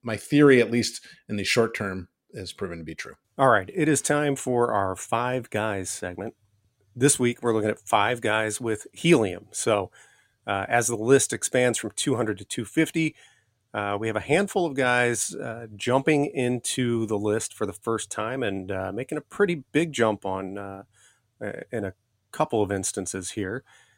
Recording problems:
none

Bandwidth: 16 kHz